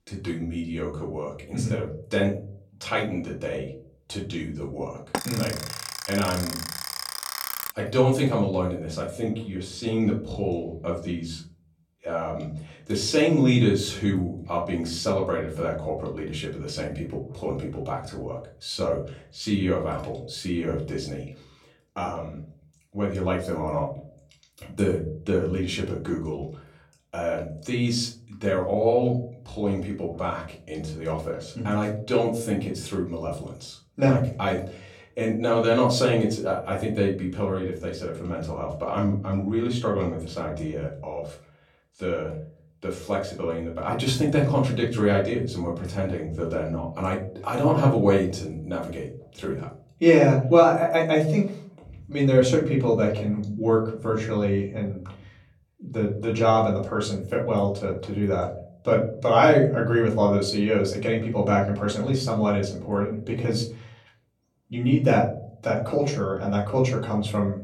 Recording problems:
off-mic speech; far
room echo; slight; dies away in 0.5 s
alarm; noticeable; from 5 to 7.5 s; peak 4 dB below the speech

